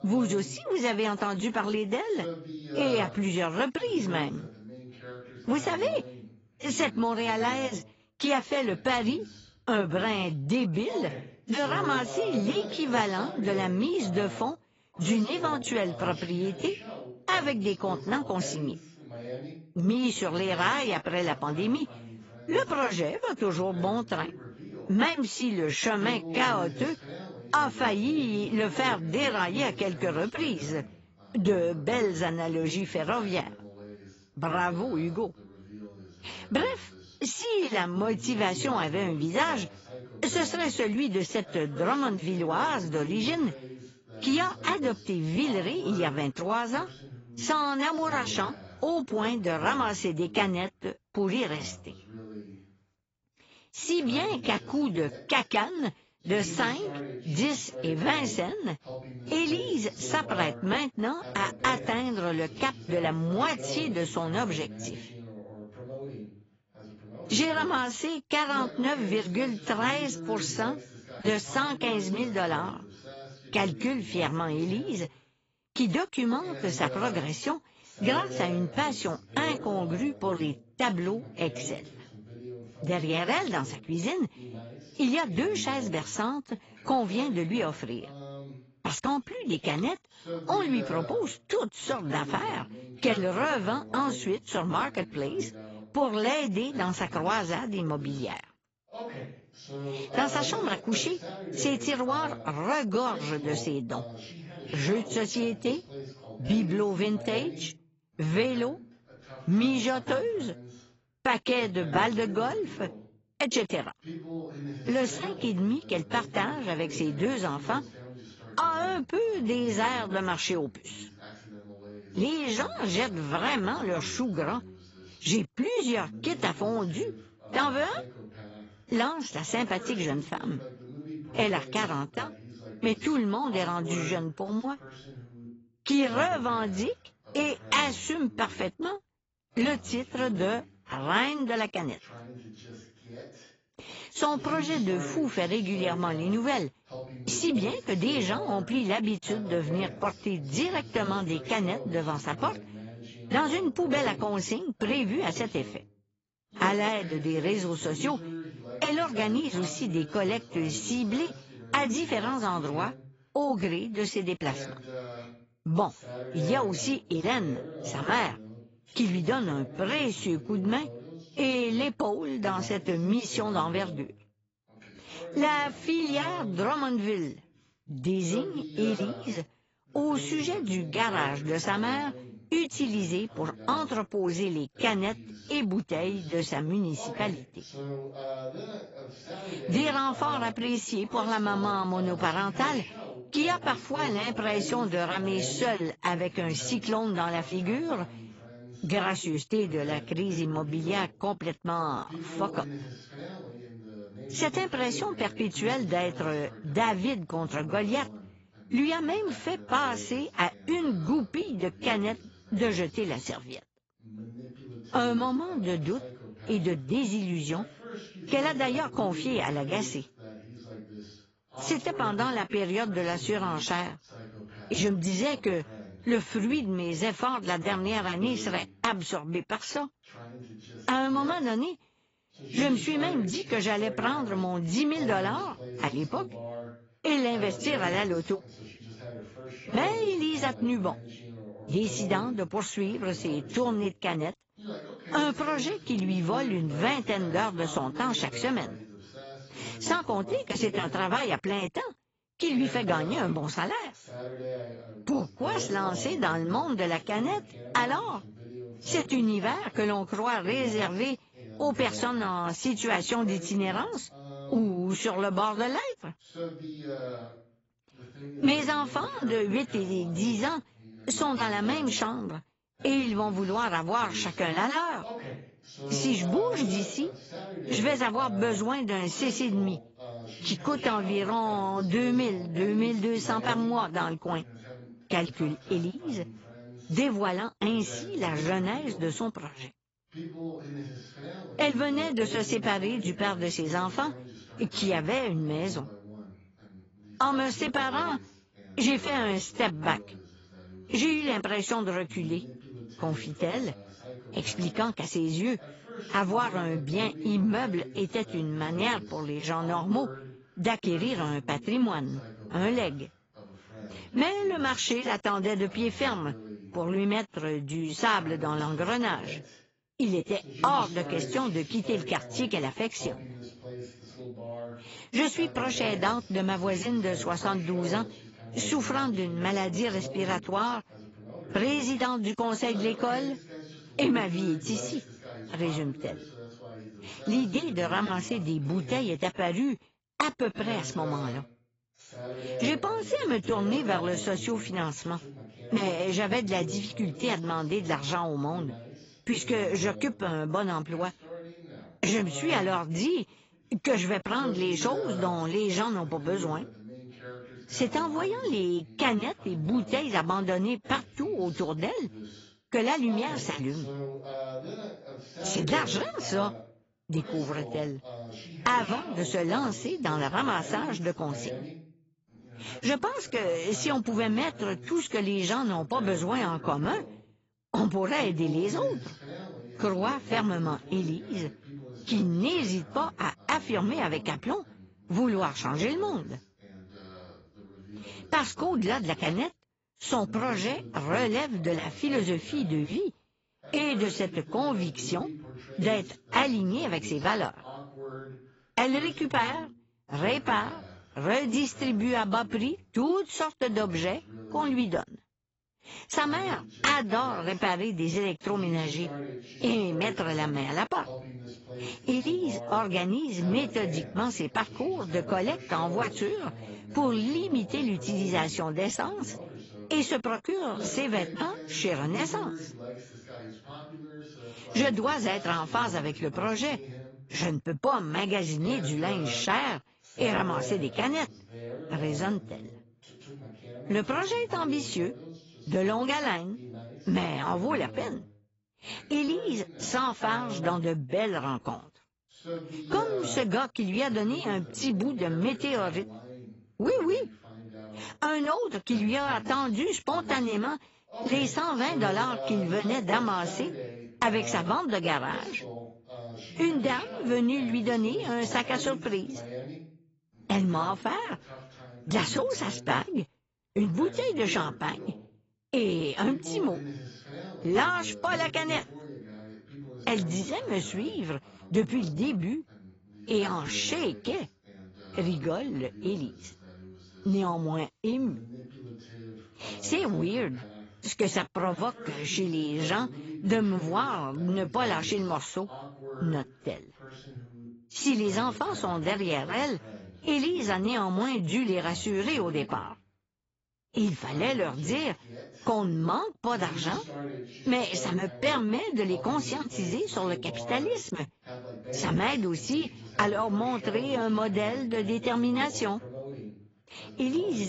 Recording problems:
garbled, watery; badly; nothing above 7.5 kHz
voice in the background; noticeable; throughout; 15 dB below the speech
abrupt cut into speech; at the end

